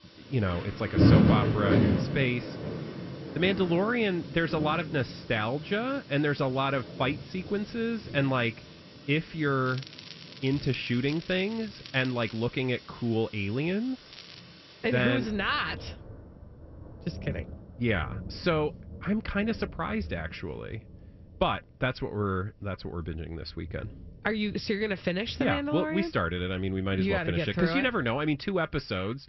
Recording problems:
high frequencies cut off; noticeable; nothing above 5.5 kHz
rain or running water; loud; throughout; 2 dB below the speech
crackling; noticeable; from 9.5 to 12 s and at 14 s; 15 dB below the speech

